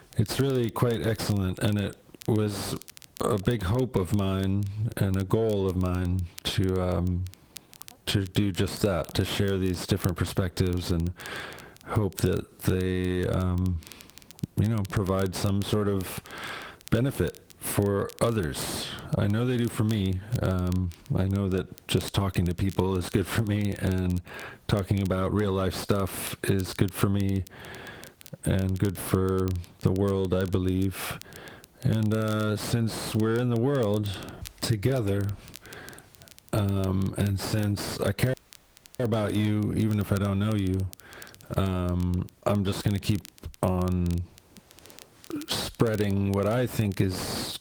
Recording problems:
distortion; slight; 10 dB below the speech
garbled, watery; slightly; nothing above 19 kHz
squashed, flat; somewhat
crackle, like an old record; faint; 20 dB below the speech
audio cutting out; at 38 s for 0.5 s

